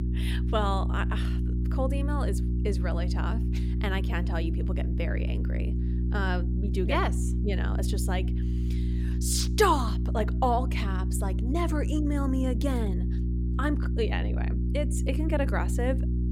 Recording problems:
electrical hum; loud; throughout; 60 Hz, 9 dB below the speech

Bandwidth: 16.5 kHz